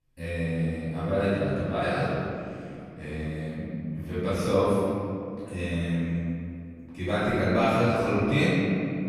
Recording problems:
room echo; strong; dies away in 2.5 s
off-mic speech; far

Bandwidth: 14.5 kHz